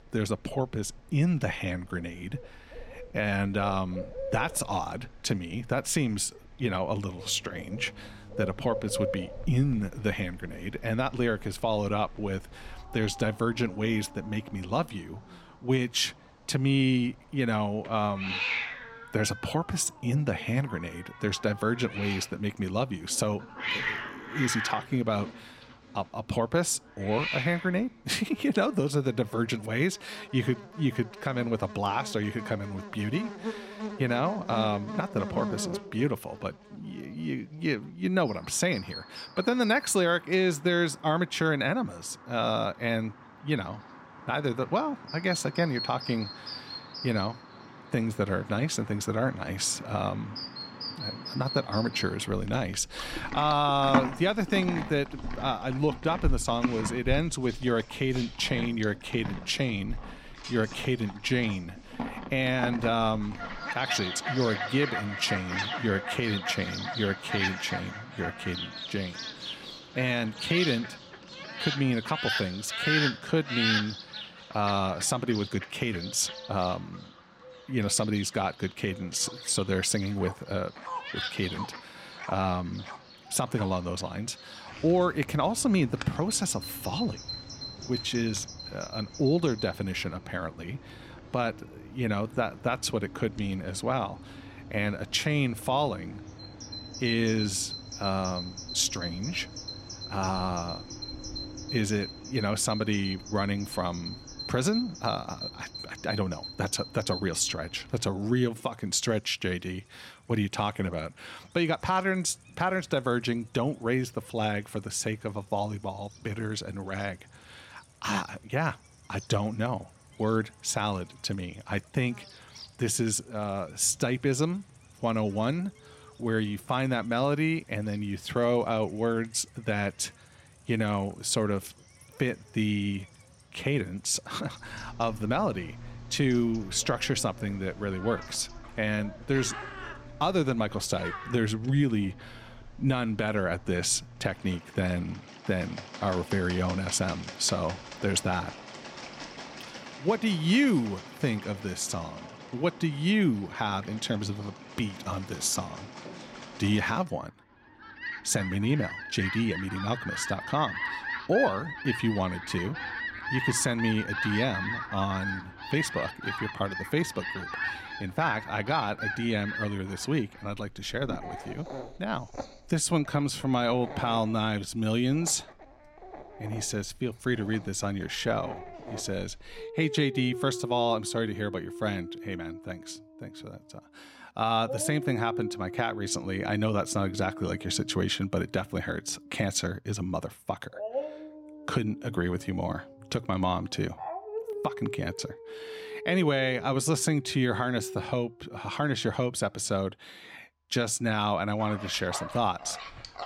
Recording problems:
animal sounds; loud; throughout; 8 dB below the speech

